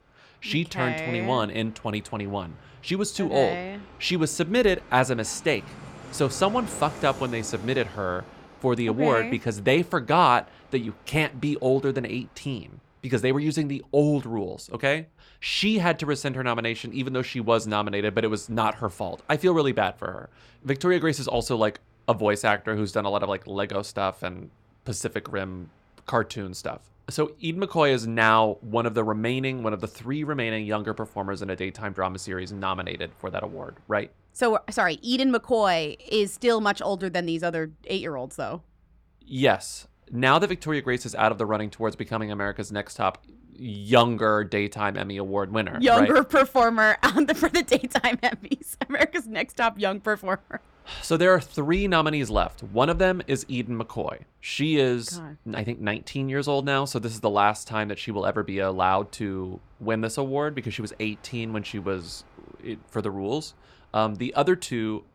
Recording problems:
train or aircraft noise; faint; throughout; 25 dB below the speech

